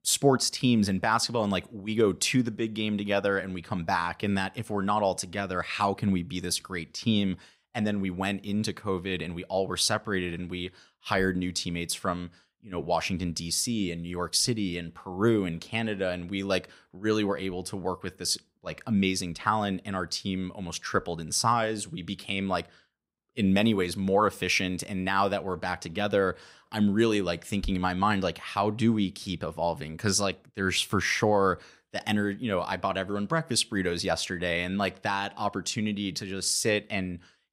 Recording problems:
none

